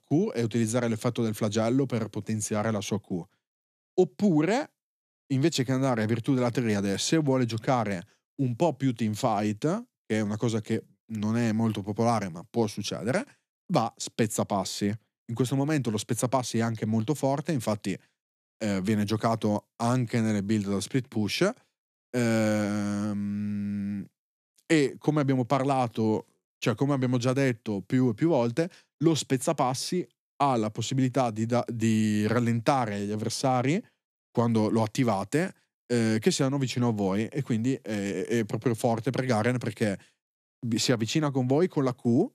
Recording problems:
none

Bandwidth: 14 kHz